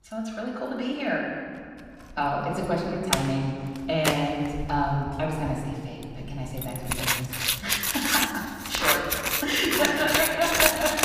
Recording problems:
off-mic speech; far
room echo; noticeable; dies away in 1.7 s
household noises; very loud; throughout; 3 dB above the speech

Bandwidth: 15 kHz